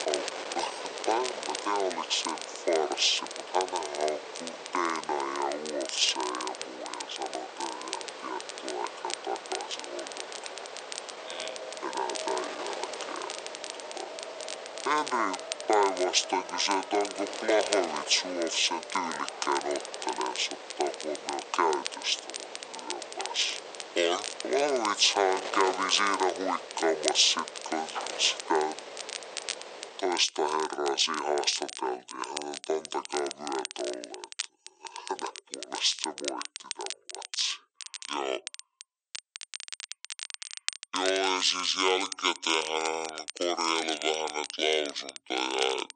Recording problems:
thin; very; fading below 450 Hz
wrong speed and pitch; too slow and too low; 0.6 times normal speed
traffic noise; noticeable; until 24 s; 20 dB below the speech
wind noise on the microphone; occasional gusts; until 30 s; 10 dB below the speech
crackle, like an old record; noticeable; 10 dB below the speech

